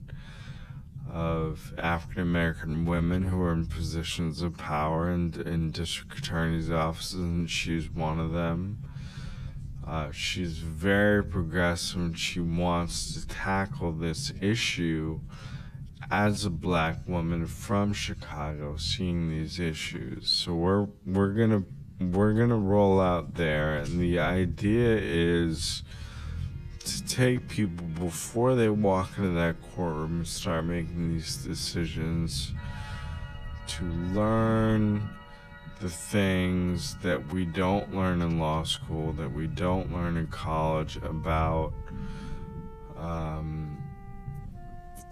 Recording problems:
wrong speed, natural pitch; too slow; 0.6 times normal speed
background music; faint; from 26 s on; 25 dB below the speech
low rumble; faint; throughout; 25 dB below the speech

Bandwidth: 14.5 kHz